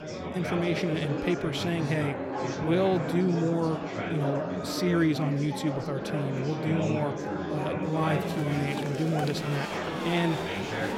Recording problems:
murmuring crowd; loud; throughout; 3 dB below the speech

